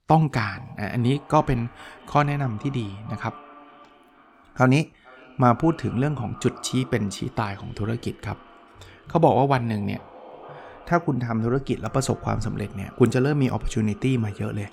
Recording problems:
echo of what is said; faint; throughout; 450 ms later, 20 dB below the speech

